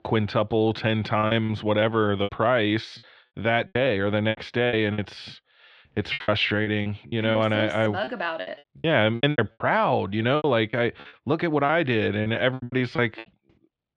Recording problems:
muffled; slightly; fading above 3.5 kHz
choppy; very; 14% of the speech affected

